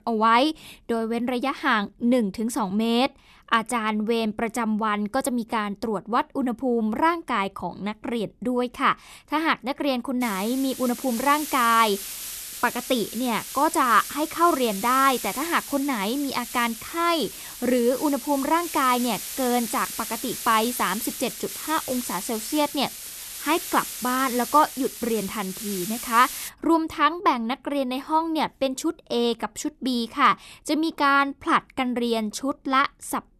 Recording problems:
hiss; loud; from 10 to 26 s; 9 dB below the speech

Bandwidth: 13.5 kHz